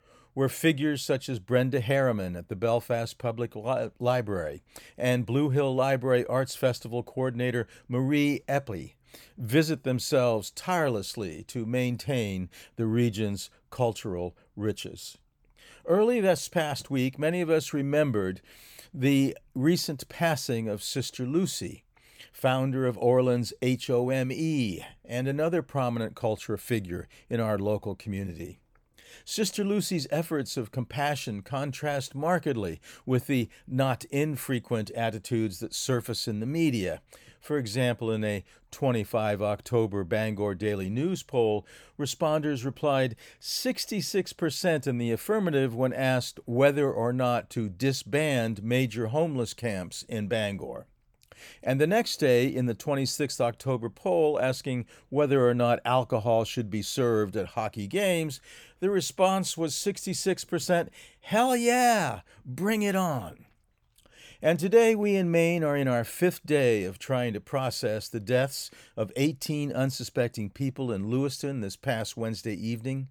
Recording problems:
none

